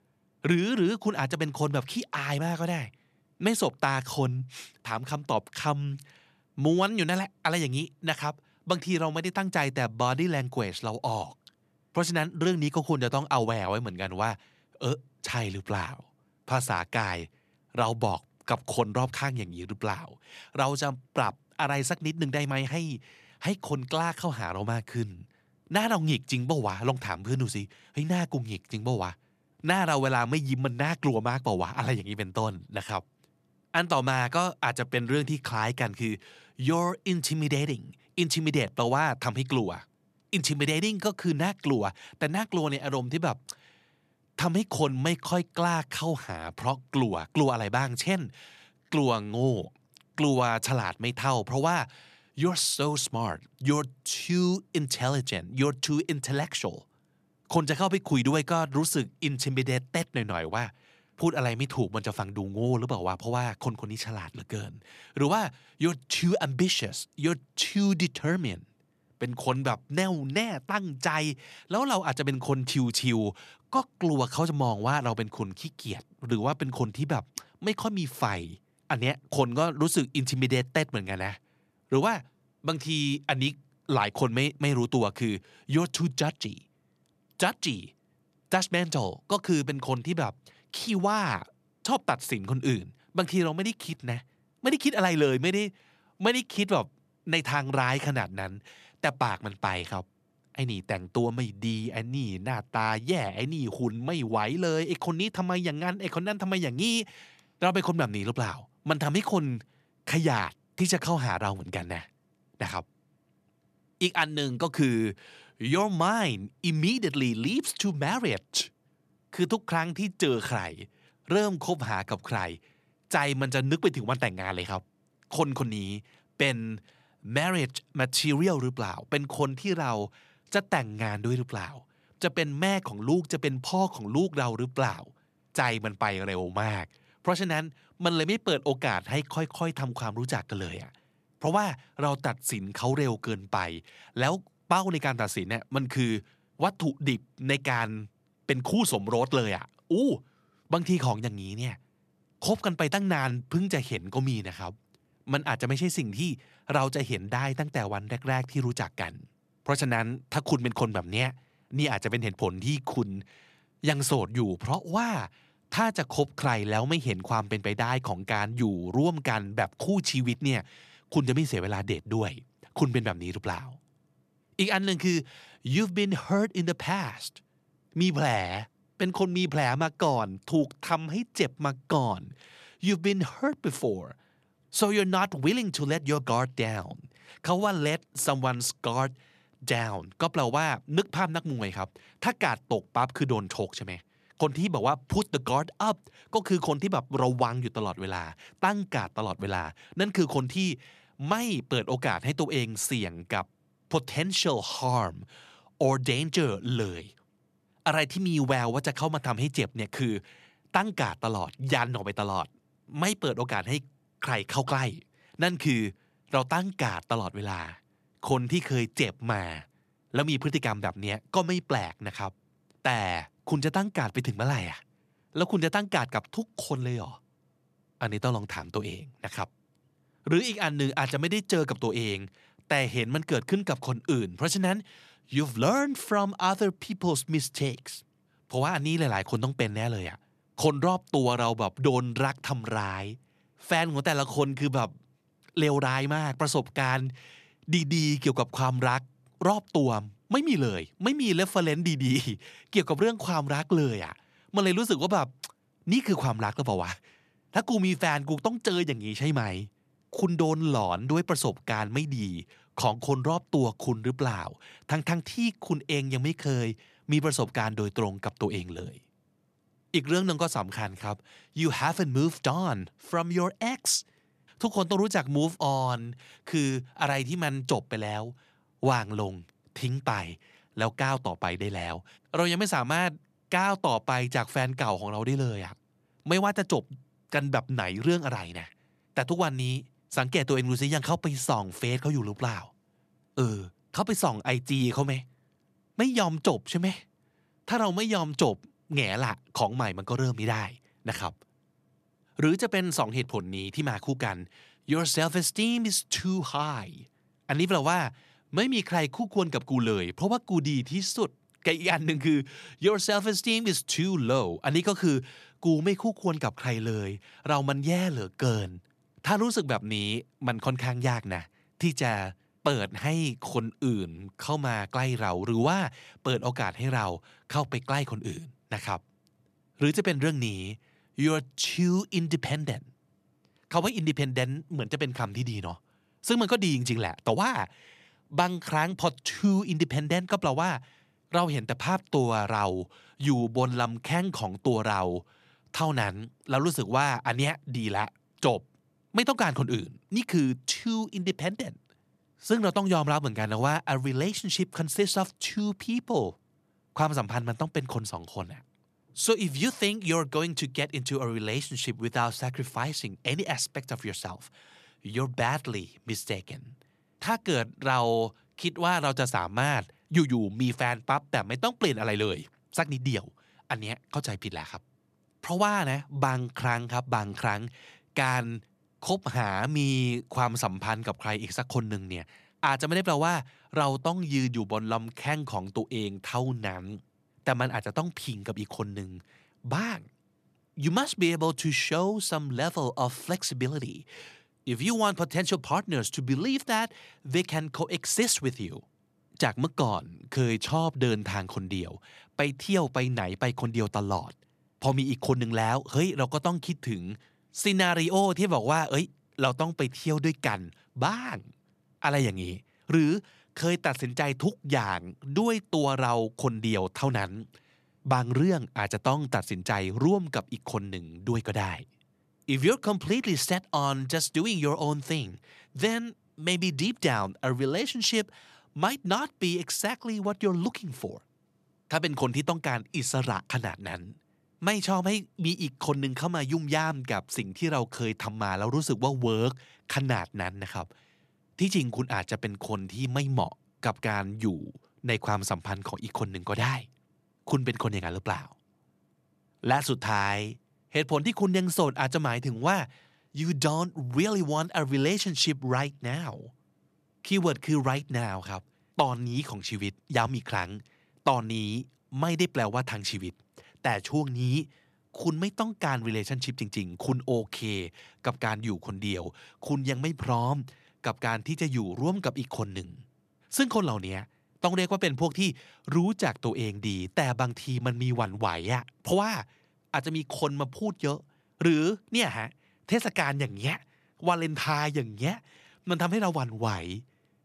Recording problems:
none

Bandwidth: 14 kHz